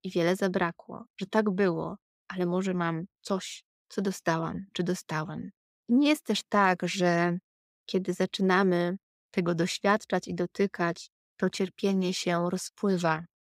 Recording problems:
none

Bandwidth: 15.5 kHz